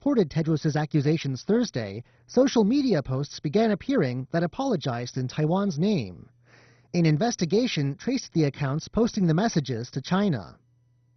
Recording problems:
garbled, watery; badly; nothing above 6 kHz

